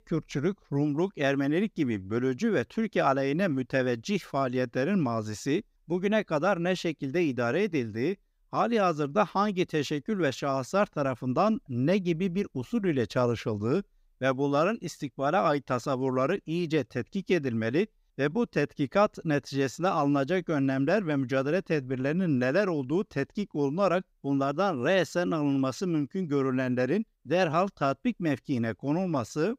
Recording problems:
none

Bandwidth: 15.5 kHz